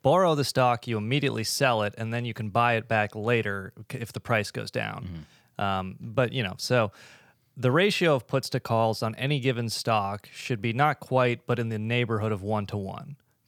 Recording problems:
none

